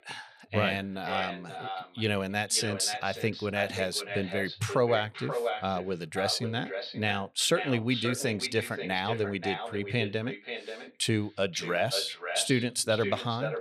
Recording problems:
echo of what is said; strong; throughout; 530 ms later, 7 dB below the speech

